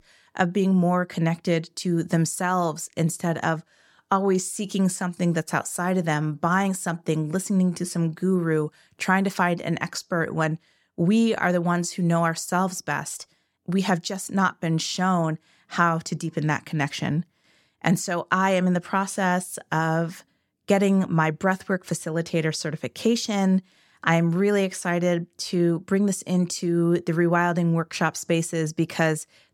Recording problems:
none

